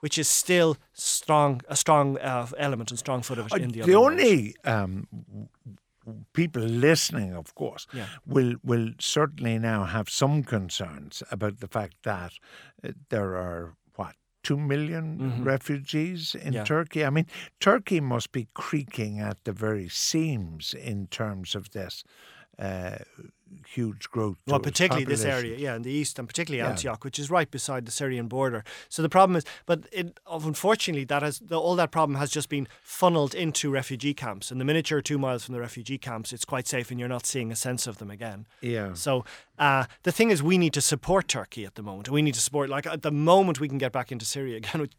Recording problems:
none

